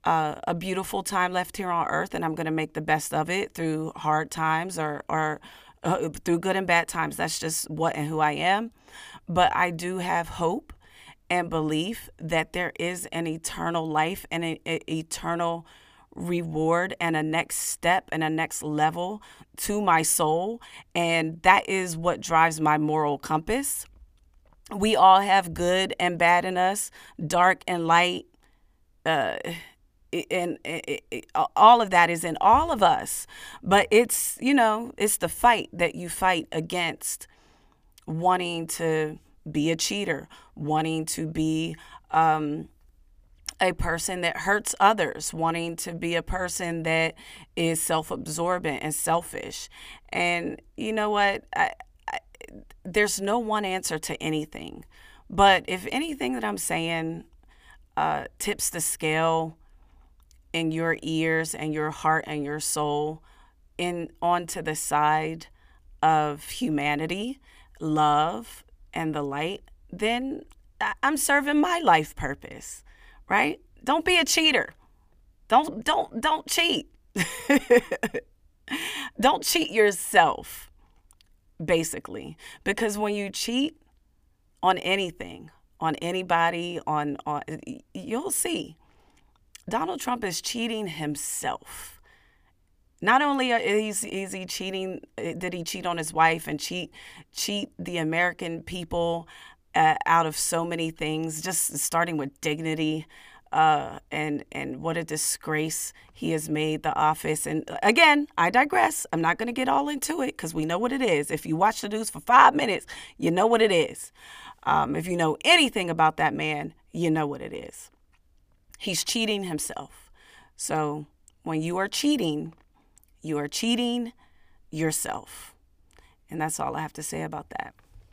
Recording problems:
none

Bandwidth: 15 kHz